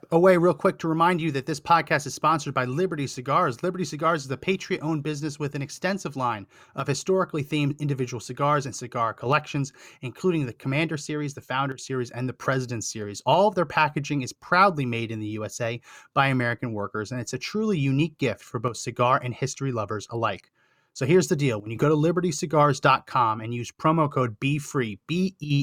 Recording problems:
abrupt cut into speech; at the end

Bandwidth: 18.5 kHz